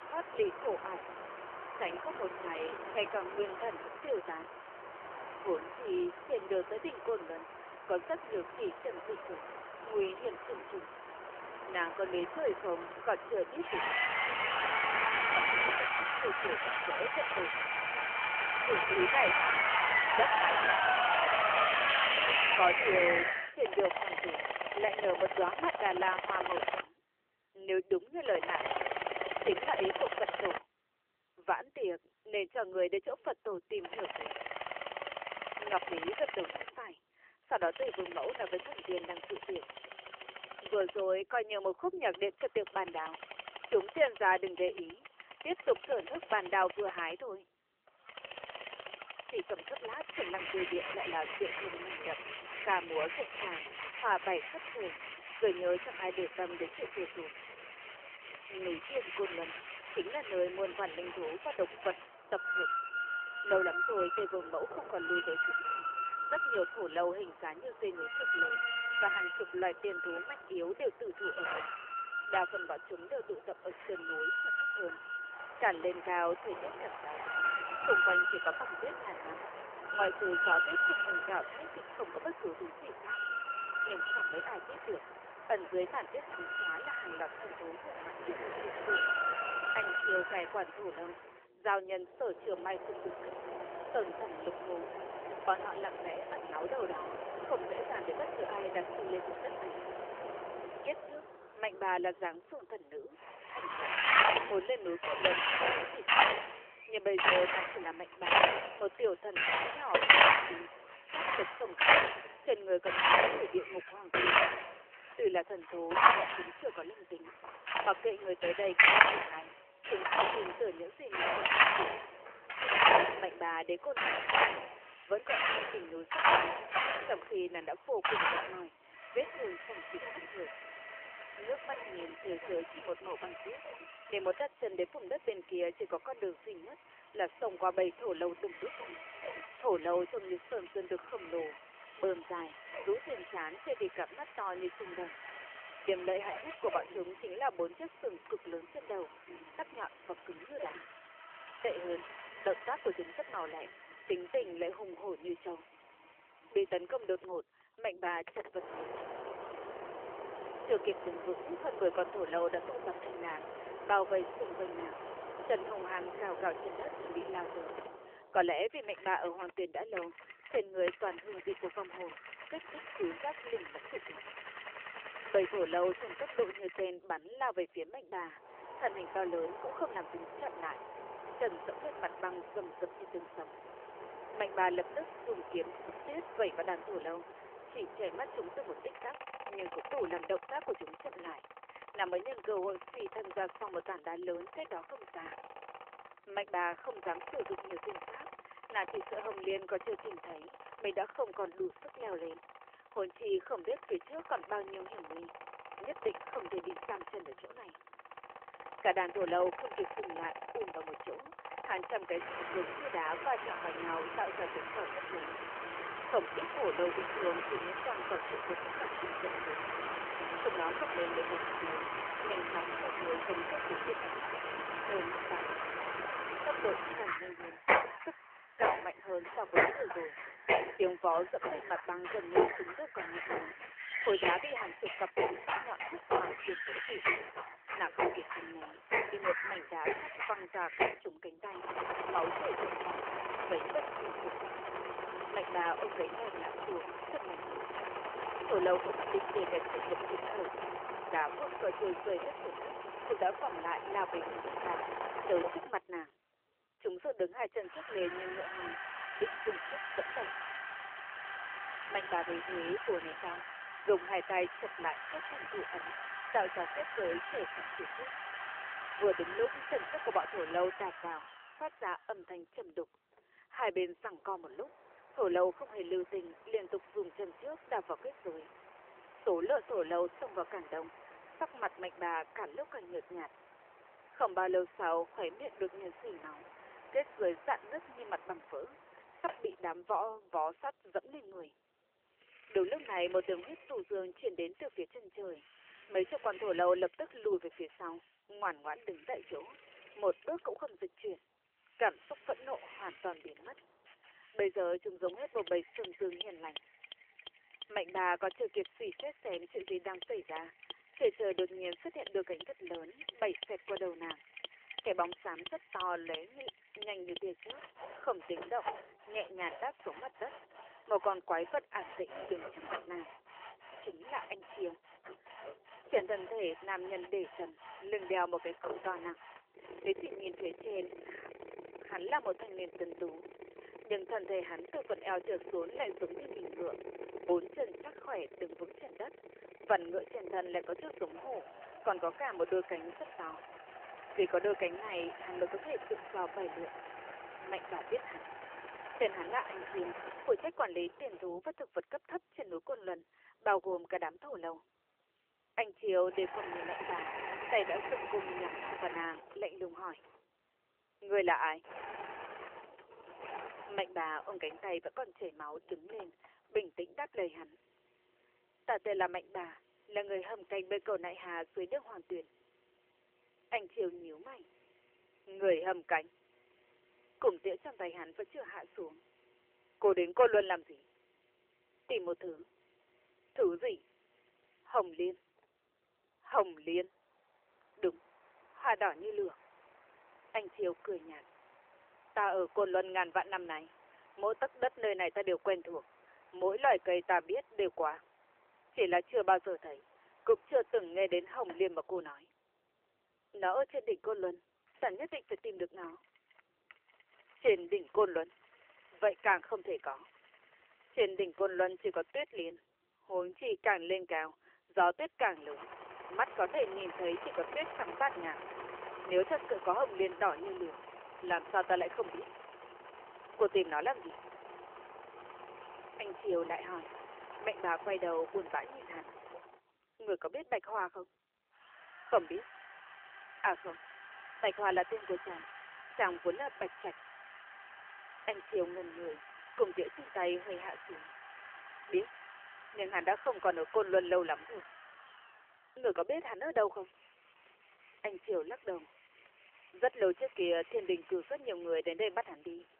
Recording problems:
phone-call audio; nothing above 3 kHz
machinery noise; very loud; throughout; 2 dB above the speech

